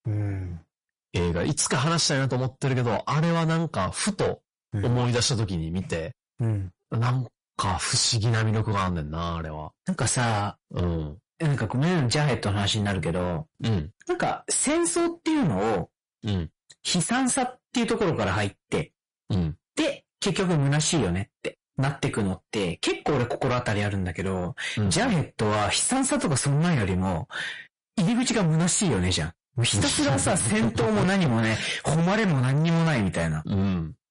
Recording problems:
distortion; heavy; 6 dB below the speech
garbled, watery; slightly; nothing above 10.5 kHz

